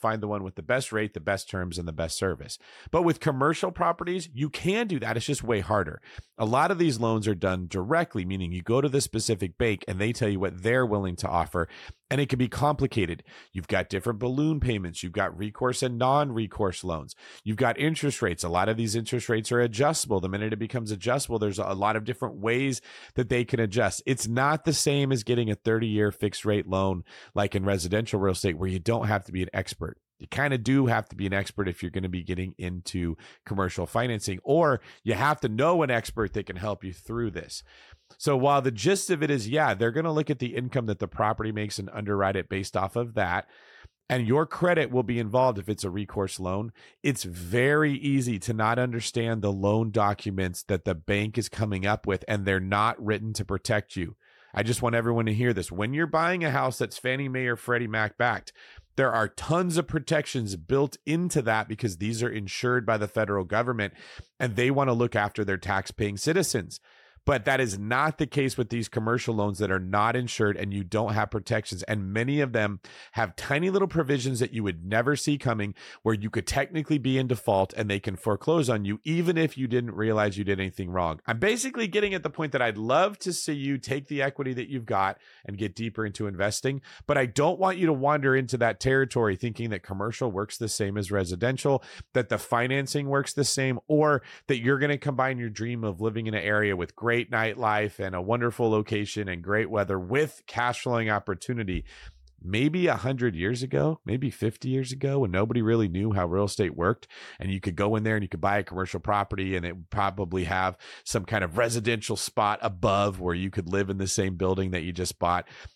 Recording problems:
none

